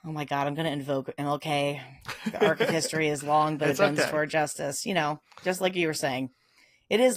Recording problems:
garbled, watery; slightly; nothing above 14.5 kHz
abrupt cut into speech; at the end

